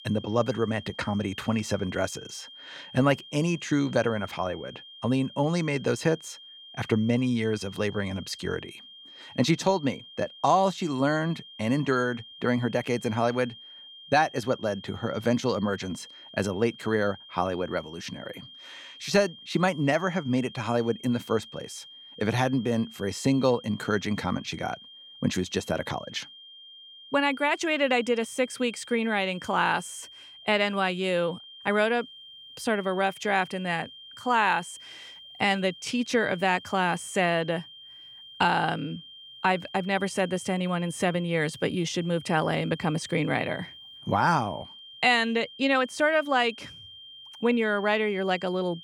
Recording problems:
high-pitched whine; noticeable; throughout; 3 kHz, 20 dB below the speech

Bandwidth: 18 kHz